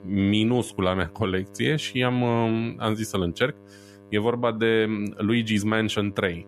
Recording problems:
electrical hum; faint; throughout; 50 Hz, 25 dB below the speech

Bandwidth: 14.5 kHz